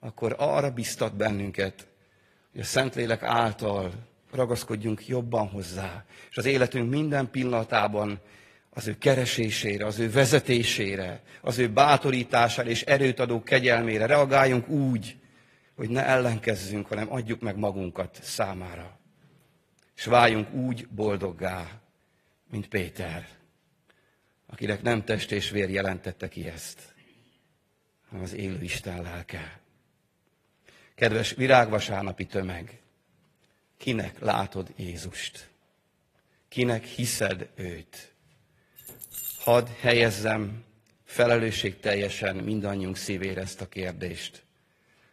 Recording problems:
garbled, watery; slightly; nothing above 14.5 kHz
jangling keys; noticeable; at 39 s; peak 7 dB below the speech

